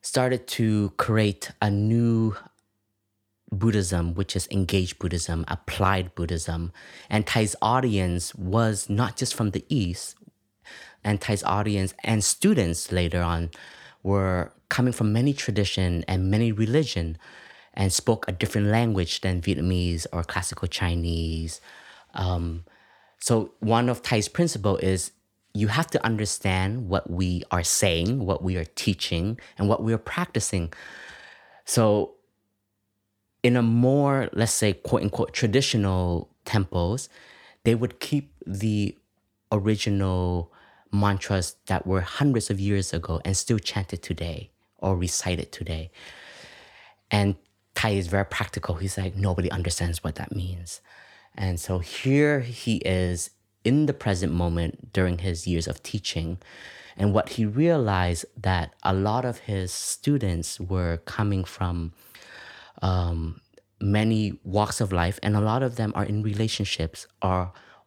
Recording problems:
none

